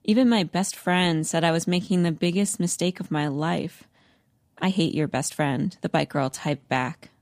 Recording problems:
uneven, jittery; strongly; from 0.5 to 6.5 s

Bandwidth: 15 kHz